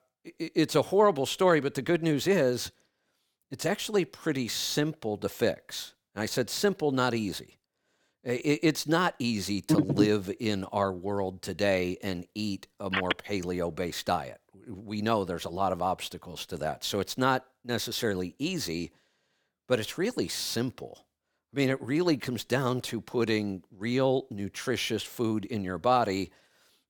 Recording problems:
none

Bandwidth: 18.5 kHz